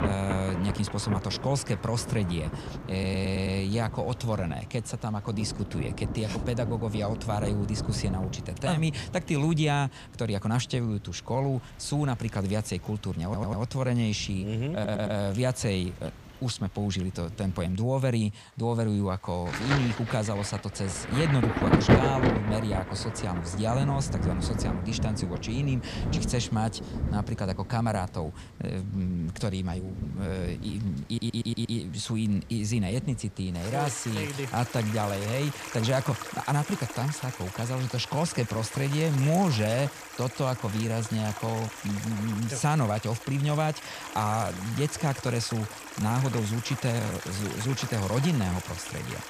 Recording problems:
rain or running water; loud; throughout; 5 dB below the speech
audio stuttering; 4 times, first at 3 s

